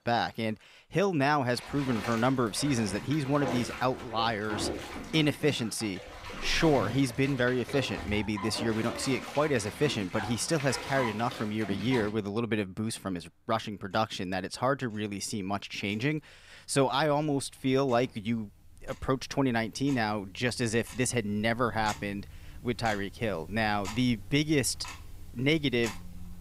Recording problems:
household noises; noticeable; throughout; 10 dB below the speech

